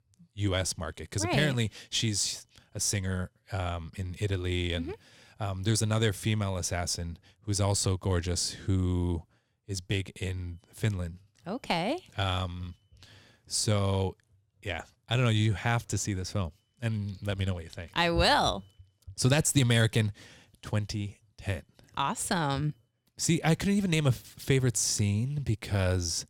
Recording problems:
none

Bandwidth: 19 kHz